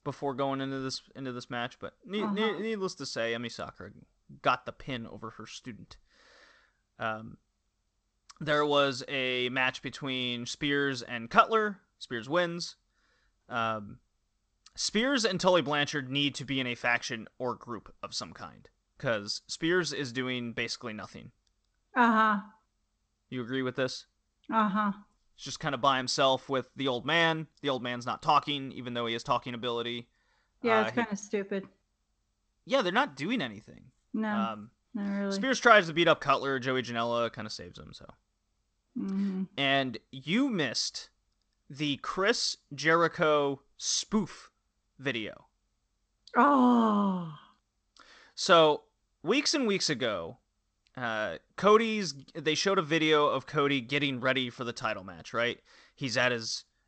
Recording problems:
garbled, watery; slightly; nothing above 8 kHz

